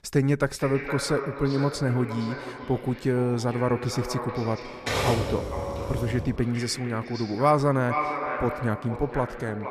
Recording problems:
echo of what is said; strong; throughout; 460 ms later, 8 dB below the speech
keyboard typing; loud; from 4.5 to 6.5 s; peak 1 dB above the speech

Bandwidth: 14 kHz